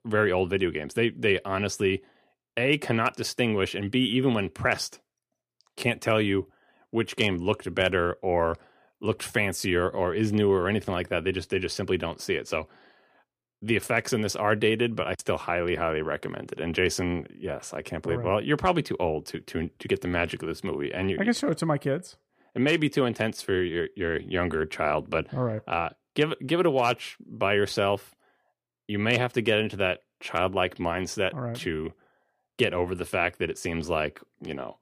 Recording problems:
none

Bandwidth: 15 kHz